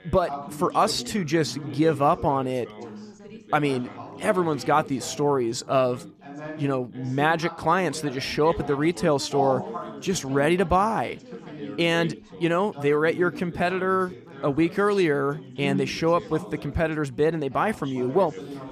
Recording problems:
background chatter; noticeable; throughout; 4 voices, 15 dB below the speech

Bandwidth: 14.5 kHz